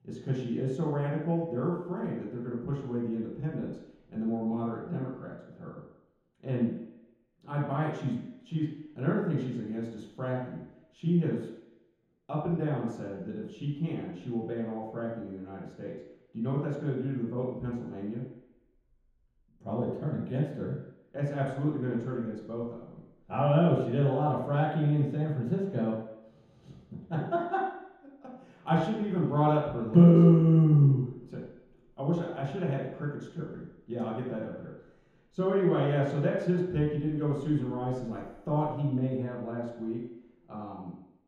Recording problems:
room echo; strong; dies away in 0.9 s
off-mic speech; far

